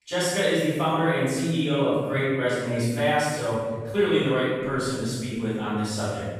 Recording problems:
room echo; strong; dies away in 1.5 s
off-mic speech; far

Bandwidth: 15 kHz